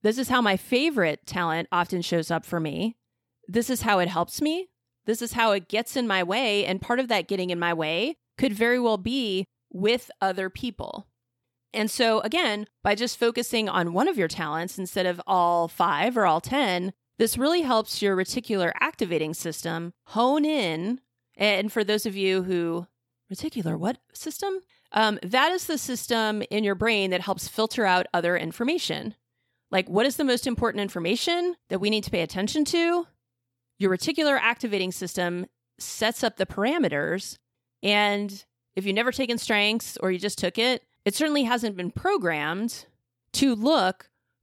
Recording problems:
none

